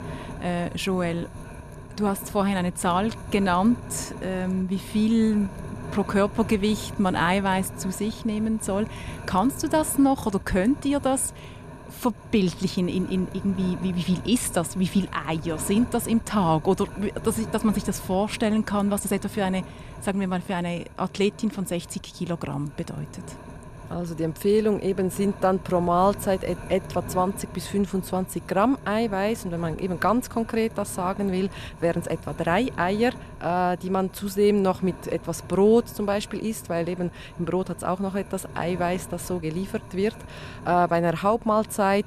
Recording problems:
wind noise on the microphone; occasional gusts; 15 dB below the speech

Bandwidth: 14 kHz